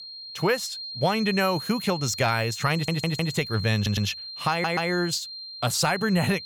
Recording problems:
high-pitched whine; loud; throughout; 4 kHz, 9 dB below the speech
audio stuttering; at 2.5 s, at 4 s and at 4.5 s

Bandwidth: 17.5 kHz